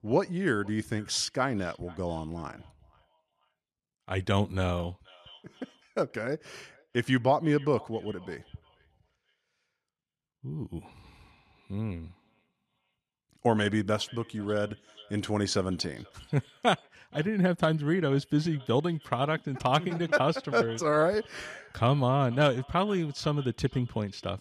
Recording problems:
echo of what is said; faint; throughout; 480 ms later, 25 dB below the speech

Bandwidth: 14 kHz